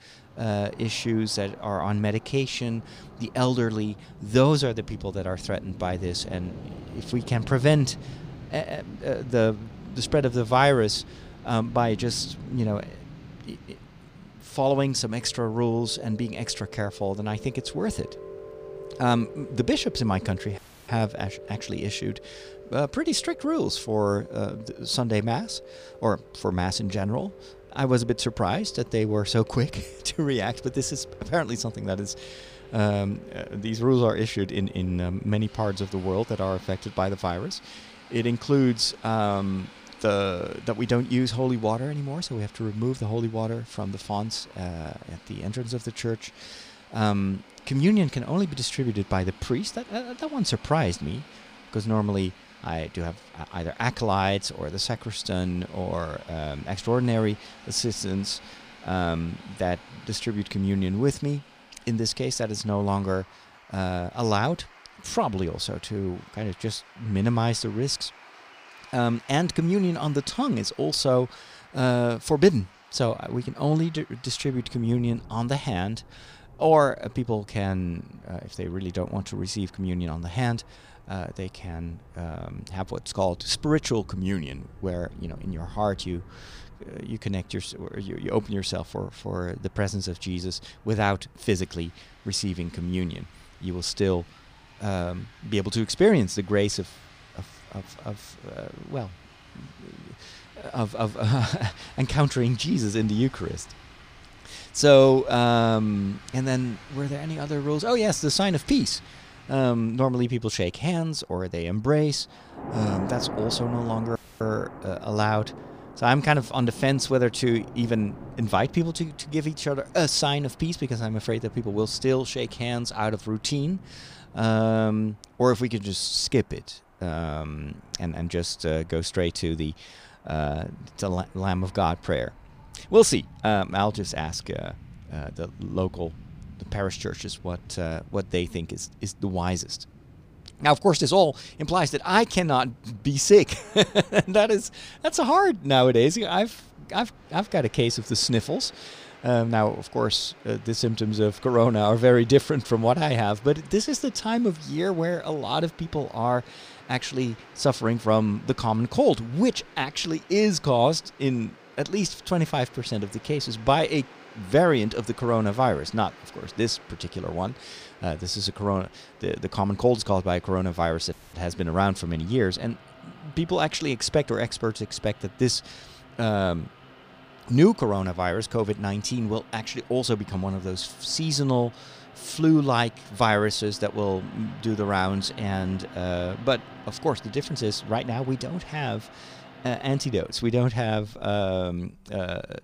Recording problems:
rain or running water; faint; throughout; 20 dB below the speech
audio cutting out; at 21 s, at 1:54 and at 2:51

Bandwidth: 15 kHz